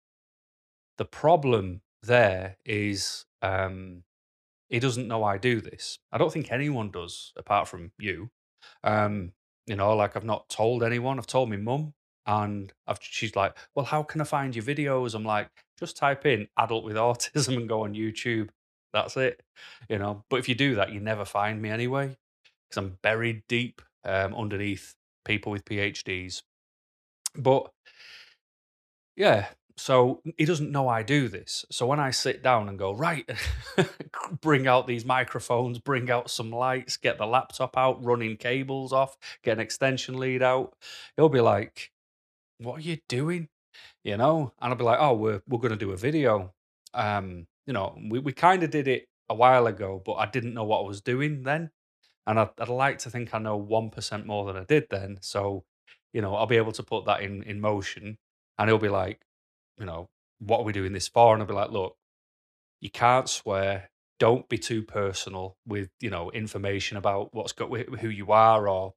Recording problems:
none

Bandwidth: 13.5 kHz